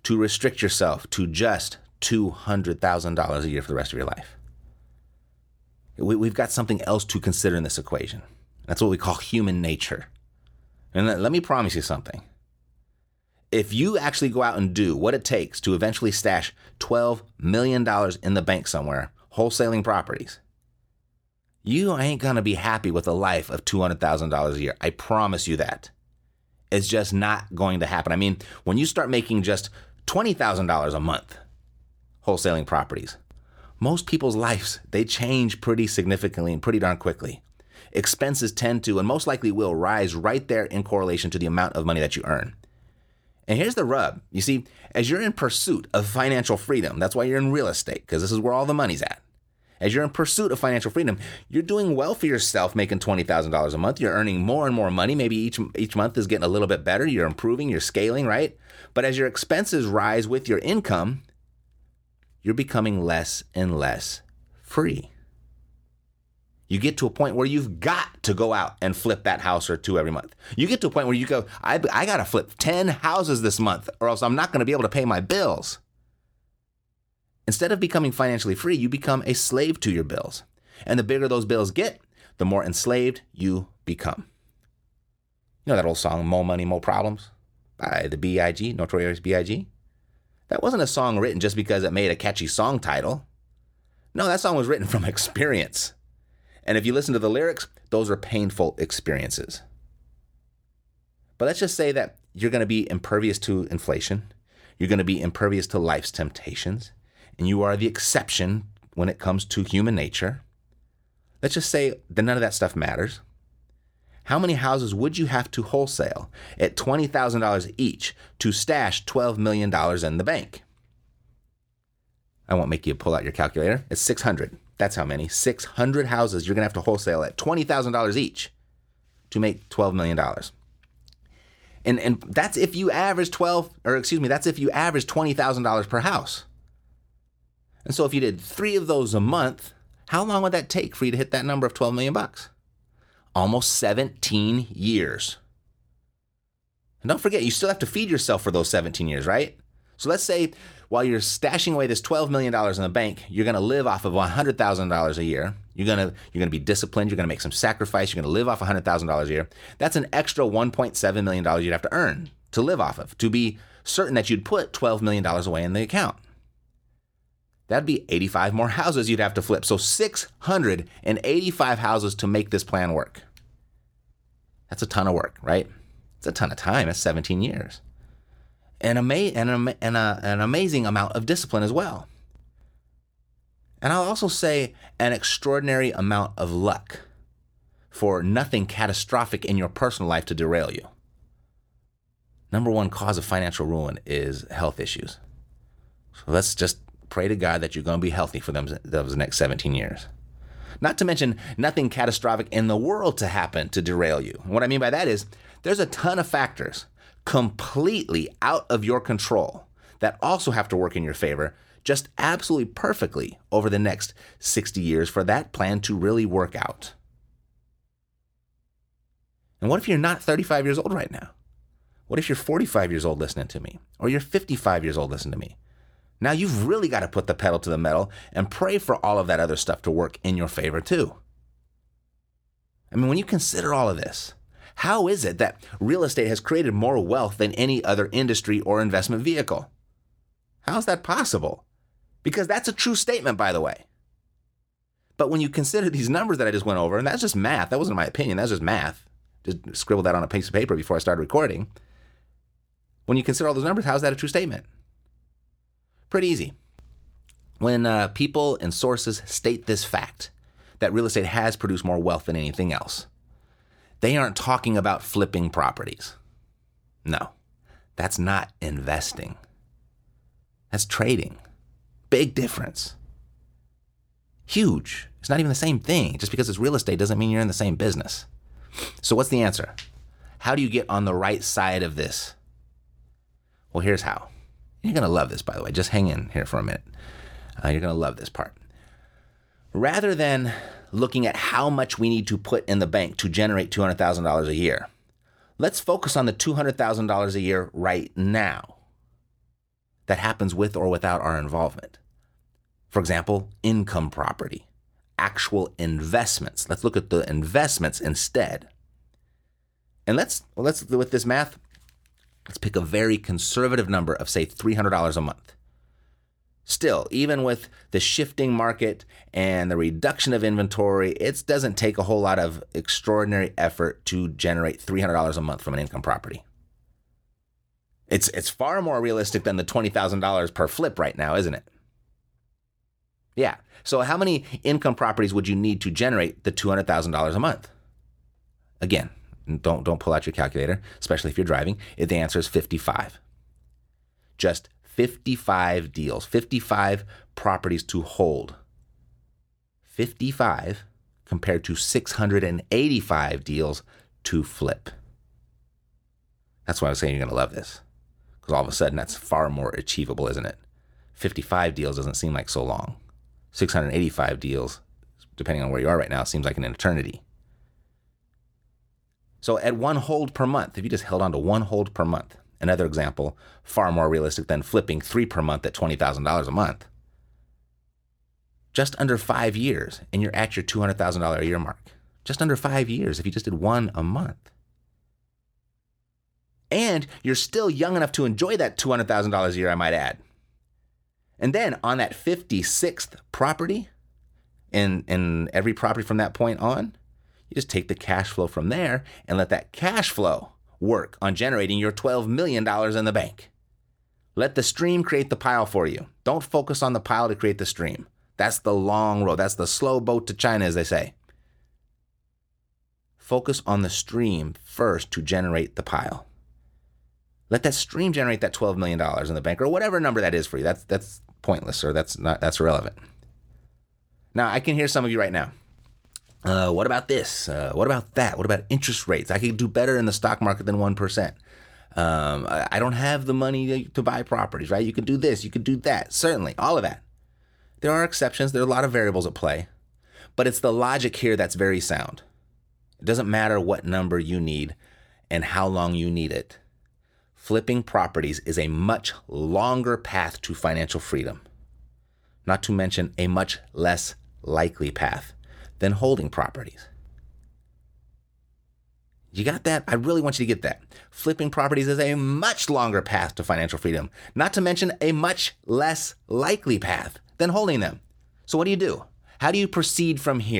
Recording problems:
abrupt cut into speech; at the end

